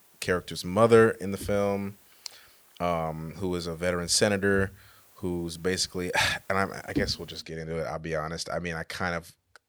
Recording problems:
hiss; faint; until 7.5 s; 25 dB below the speech

